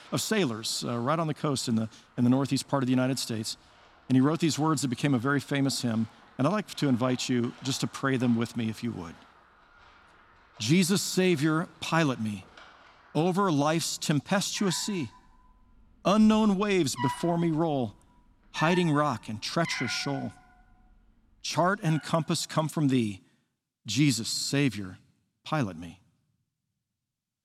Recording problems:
animal sounds; noticeable; until 21 s; 15 dB below the speech

